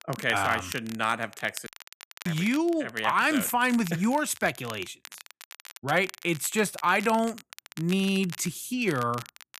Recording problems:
crackle, like an old record; noticeable; 15 dB below the speech
audio cutting out; at 1.5 s for 0.5 s

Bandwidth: 14.5 kHz